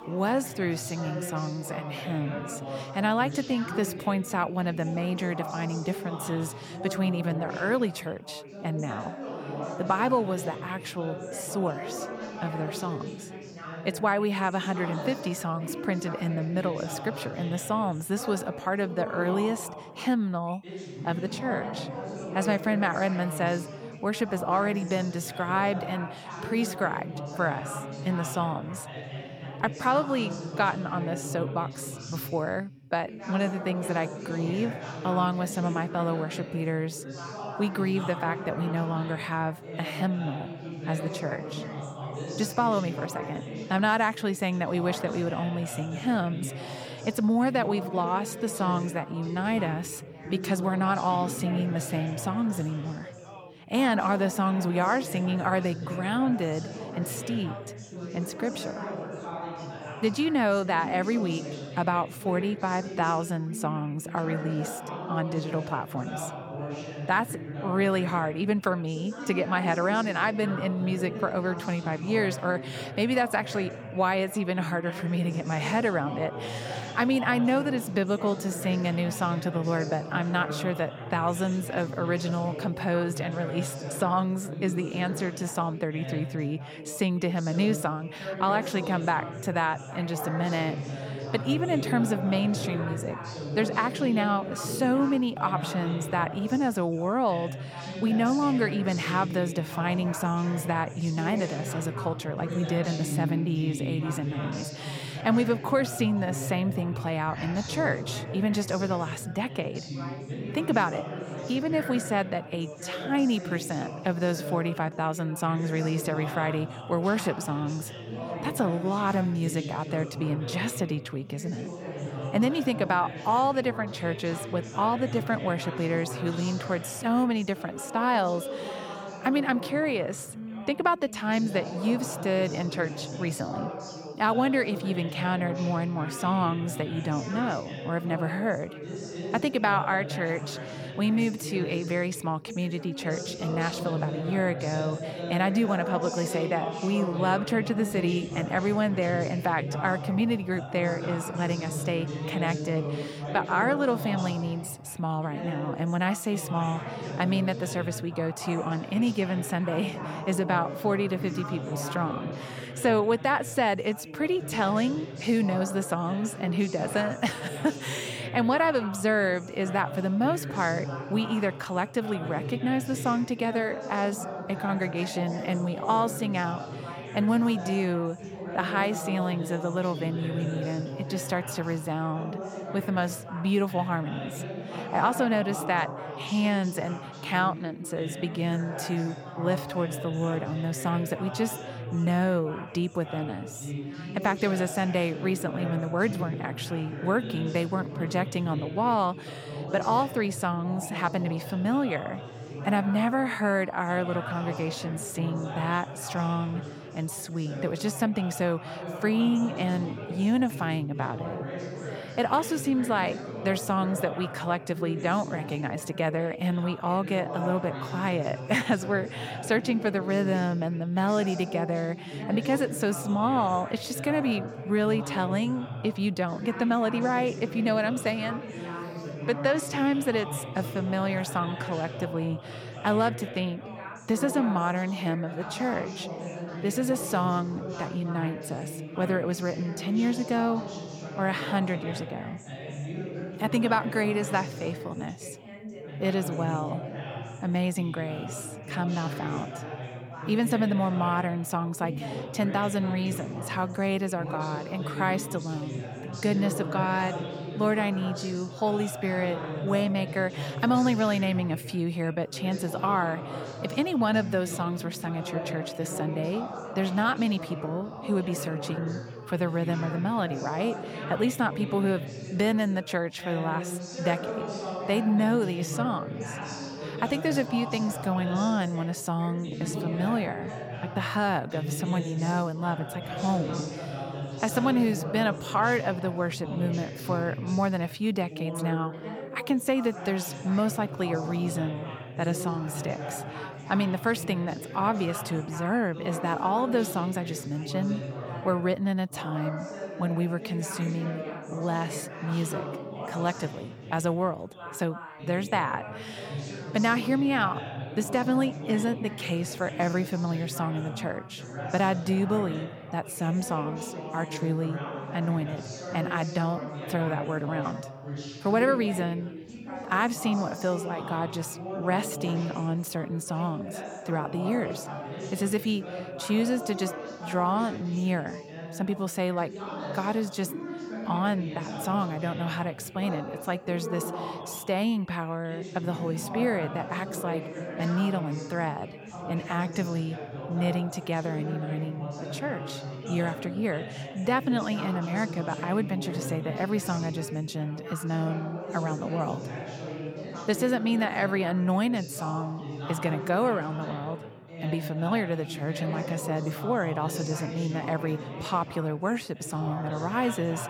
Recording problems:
background chatter; loud; throughout; 3 voices, 8 dB below the speech

